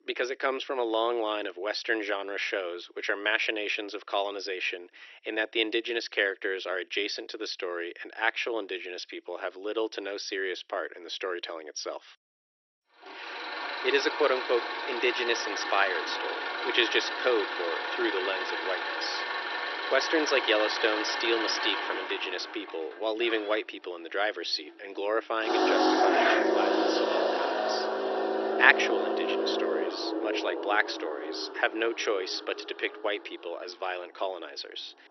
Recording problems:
thin; very; fading below 350 Hz
garbled, watery; slightly; nothing above 6 kHz
traffic noise; very loud; from 13 s on; as loud as the speech

